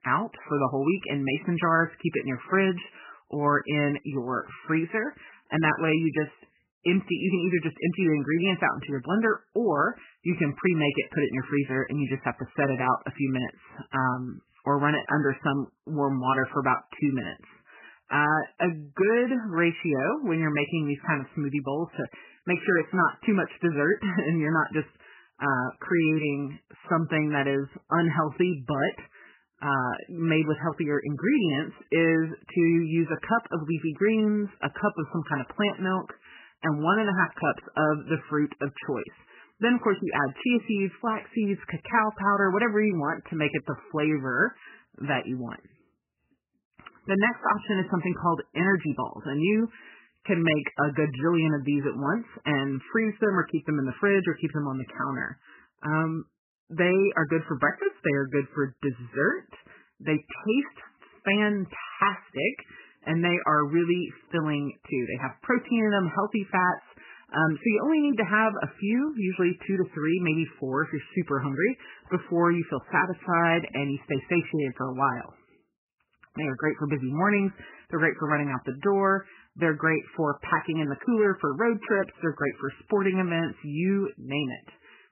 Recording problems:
garbled, watery; badly; nothing above 3 kHz

